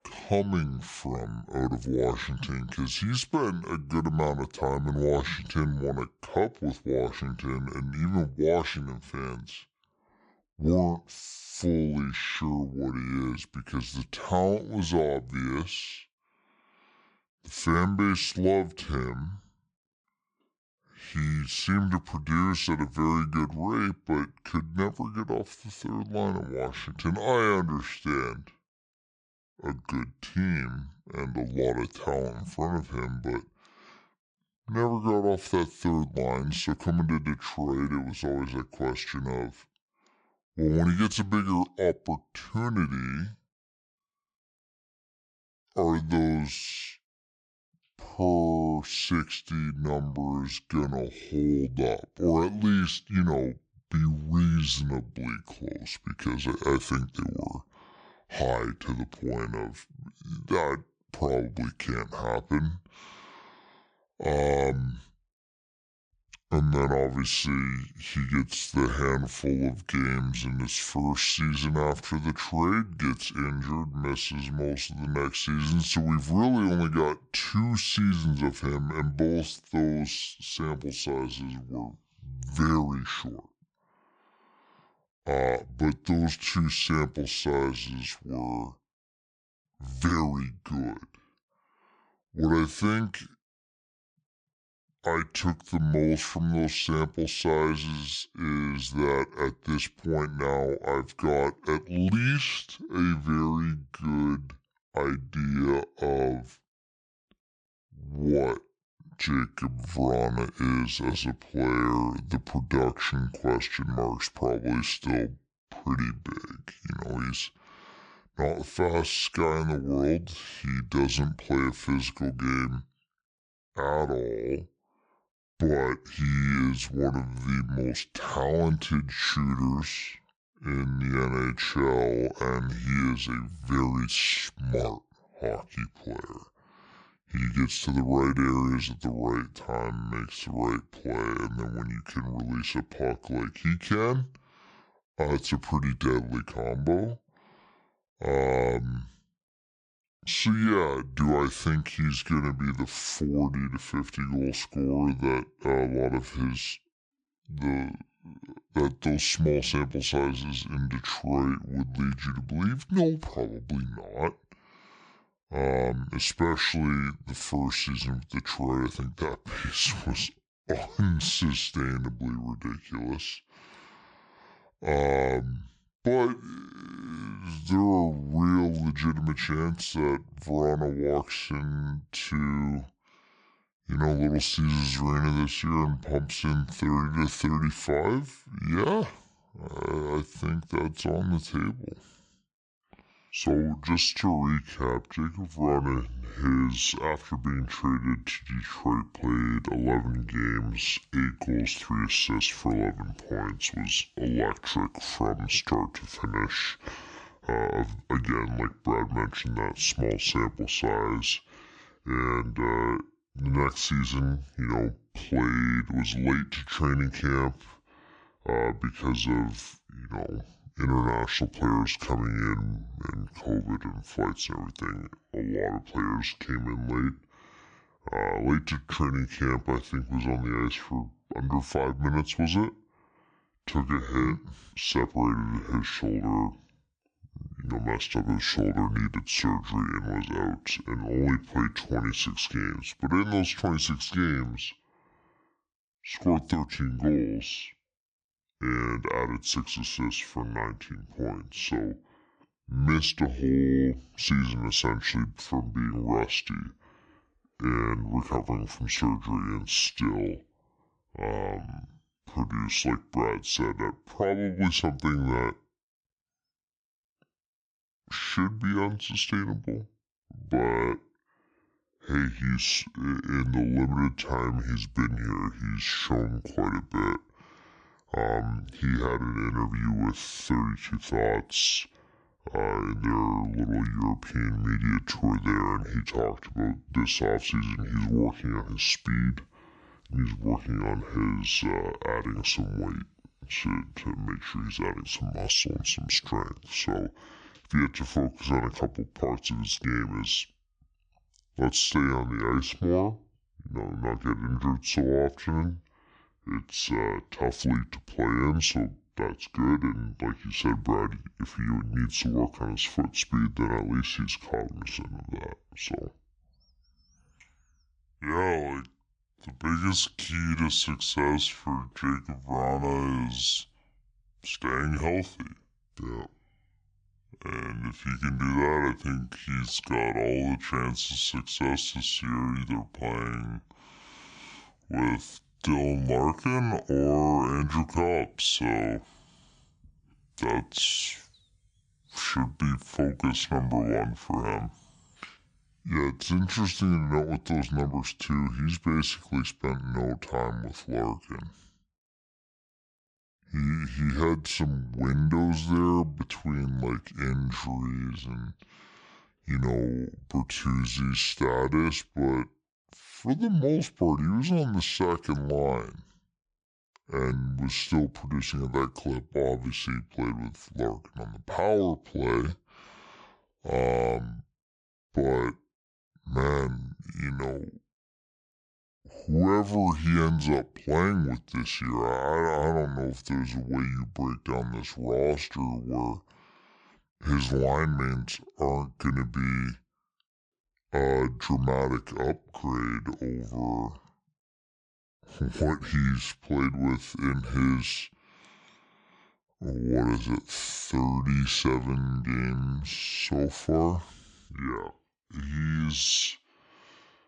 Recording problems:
wrong speed and pitch; too slow and too low; 0.6 times normal speed

